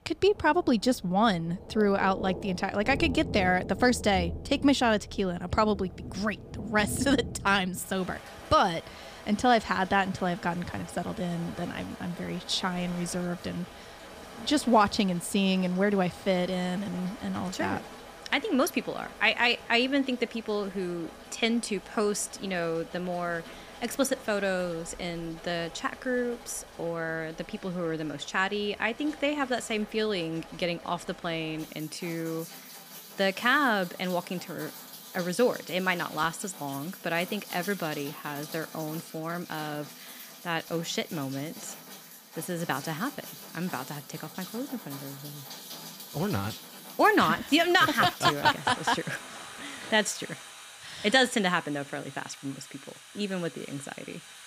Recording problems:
rain or running water; noticeable; throughout; 15 dB below the speech

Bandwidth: 15 kHz